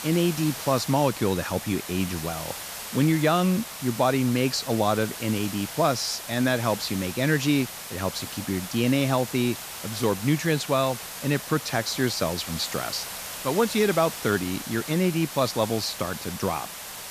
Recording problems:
hiss; loud; throughout; 9 dB below the speech

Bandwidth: 14.5 kHz